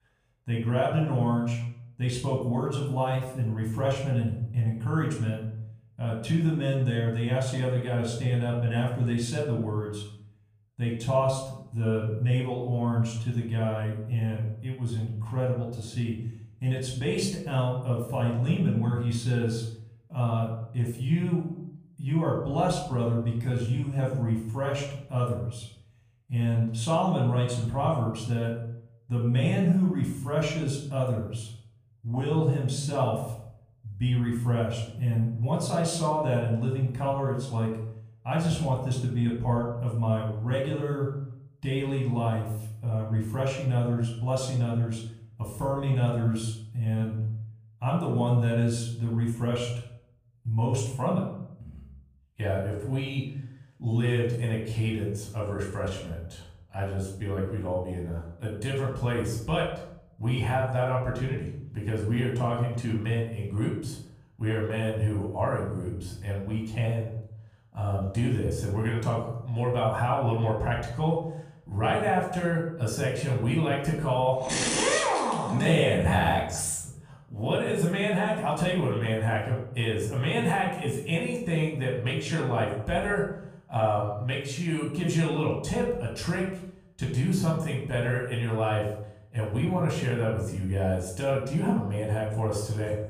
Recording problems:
off-mic speech; far
room echo; noticeable; dies away in 0.7 s

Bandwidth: 15 kHz